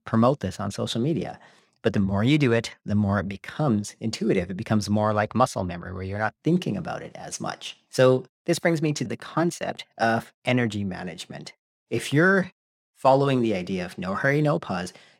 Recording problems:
none

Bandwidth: 16.5 kHz